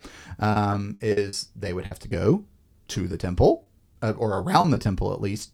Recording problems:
choppy; very; from 0.5 to 2 s and from 3 to 5 s; 11% of the speech affected

